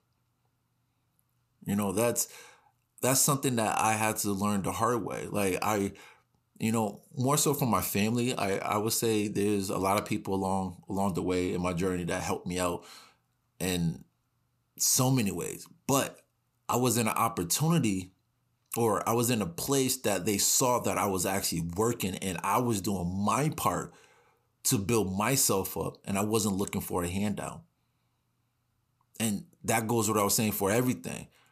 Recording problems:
none

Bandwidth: 14.5 kHz